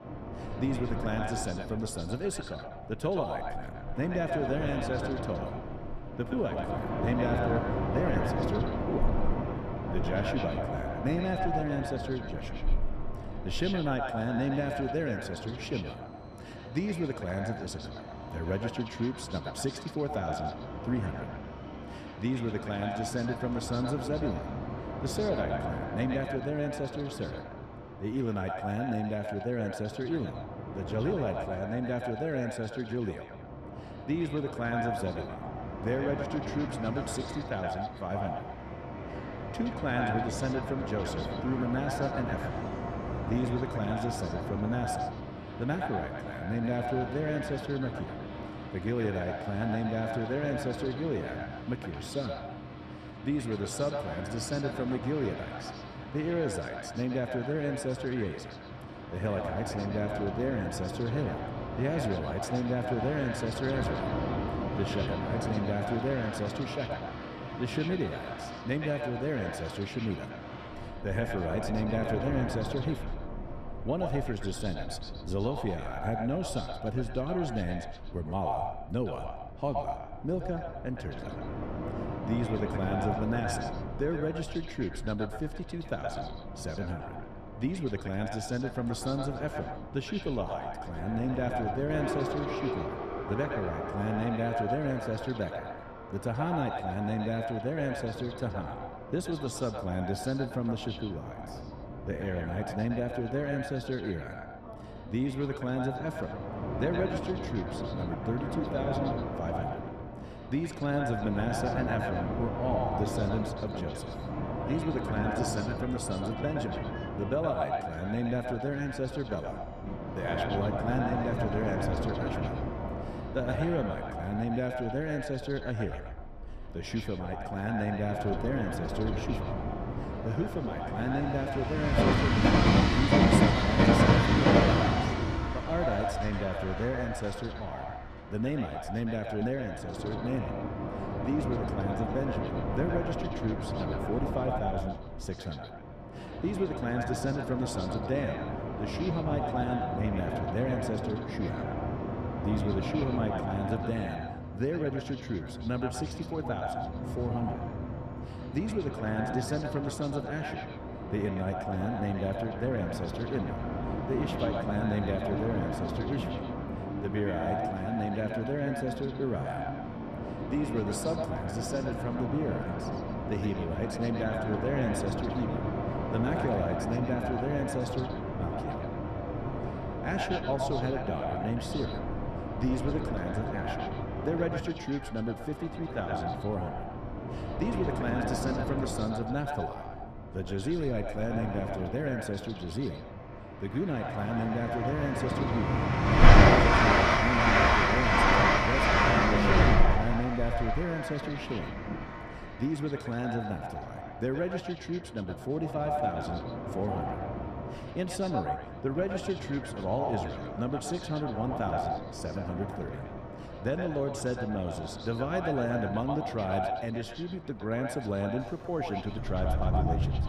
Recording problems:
echo of what is said; strong; throughout; 120 ms later, 6 dB below the speech
train or aircraft noise; very loud; throughout; 1 dB above the speech

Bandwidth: 15 kHz